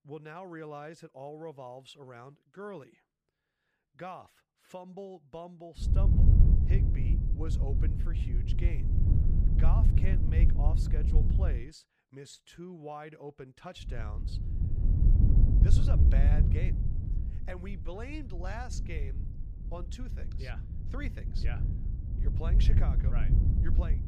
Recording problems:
wind noise on the microphone; heavy; from 6 to 12 s and from 14 s on; as loud as the speech

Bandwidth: 15 kHz